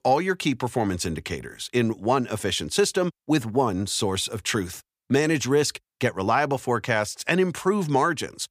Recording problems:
none

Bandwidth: 15 kHz